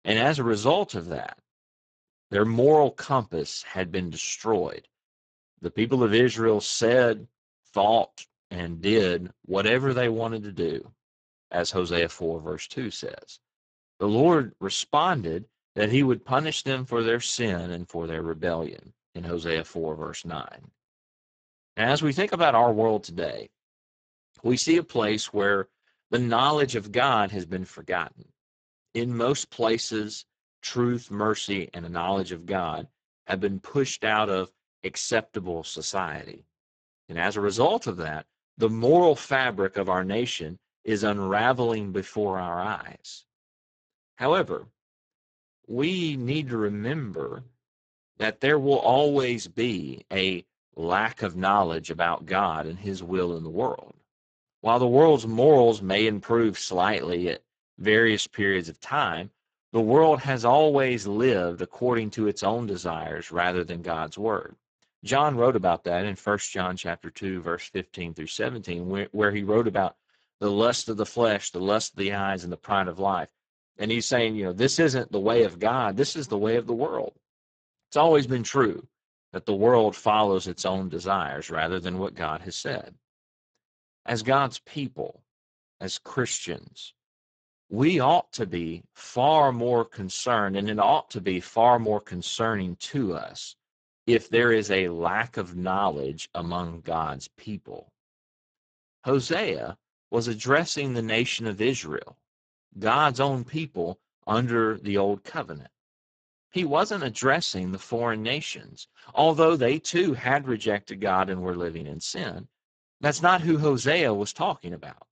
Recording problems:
garbled, watery; badly; nothing above 7.5 kHz

